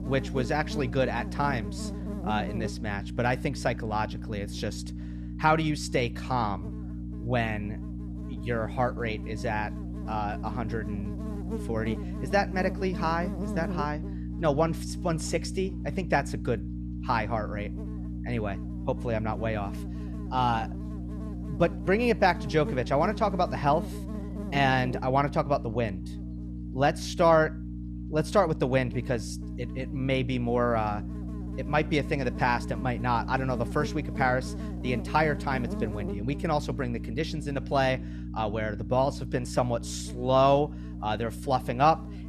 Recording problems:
electrical hum; noticeable; throughout; 60 Hz, 15 dB below the speech

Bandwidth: 14 kHz